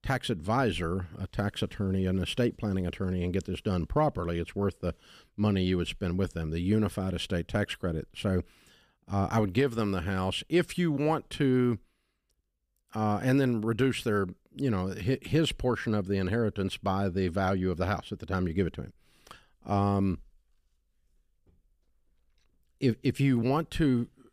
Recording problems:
none

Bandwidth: 15 kHz